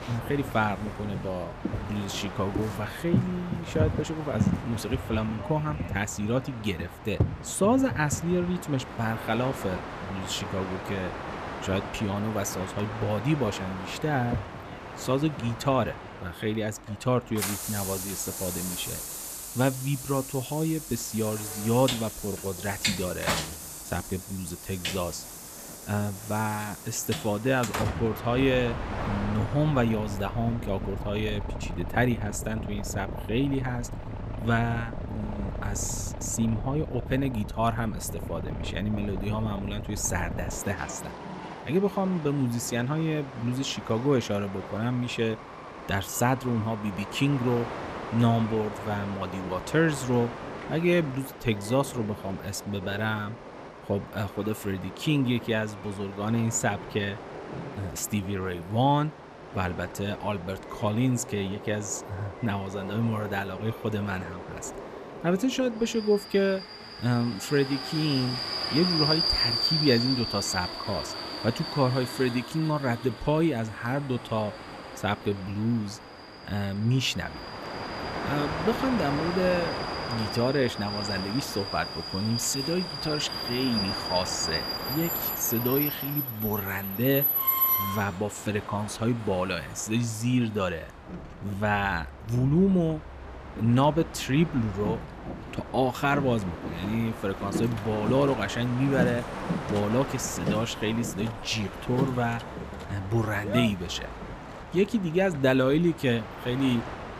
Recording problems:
train or aircraft noise; loud; throughout; 5 dB below the speech

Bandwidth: 14.5 kHz